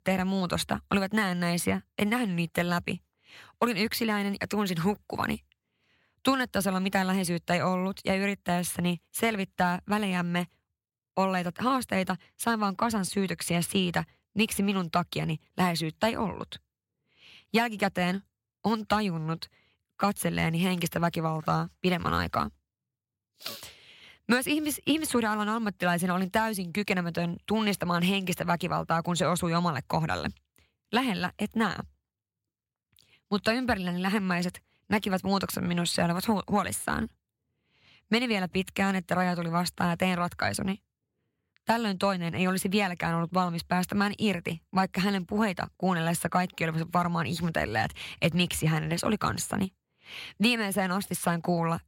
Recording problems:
none

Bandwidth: 16 kHz